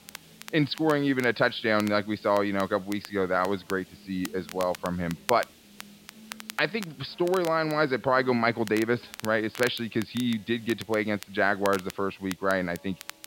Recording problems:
high frequencies cut off; noticeable; nothing above 5 kHz
crackle, like an old record; noticeable; 15 dB below the speech
background music; faint; throughout; 30 dB below the speech
hiss; faint; throughout; 25 dB below the speech

